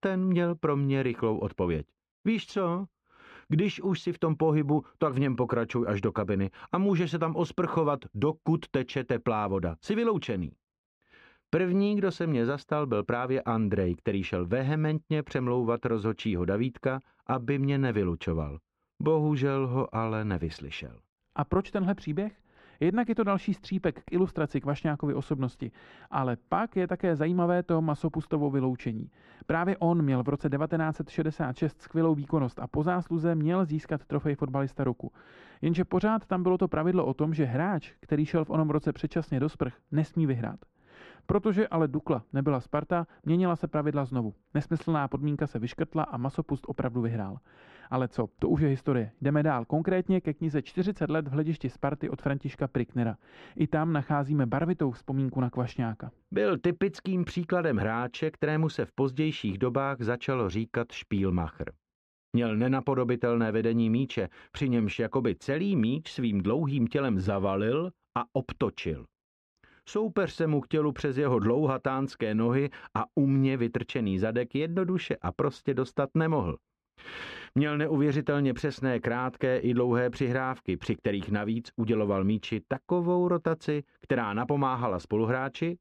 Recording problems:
muffled; very; fading above 4 kHz

